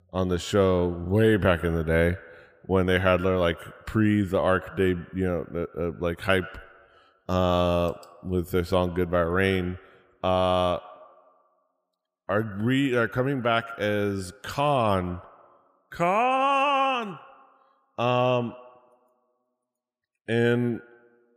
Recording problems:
echo of what is said; faint; throughout; 120 ms later, 20 dB below the speech

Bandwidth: 15 kHz